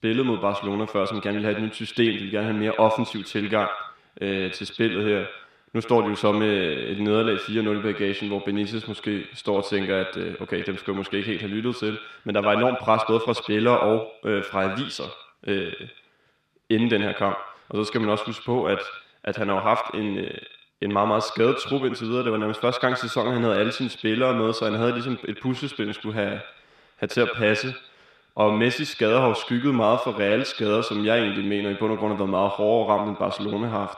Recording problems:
echo of what is said; strong; throughout; 80 ms later, 8 dB below the speech

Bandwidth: 14 kHz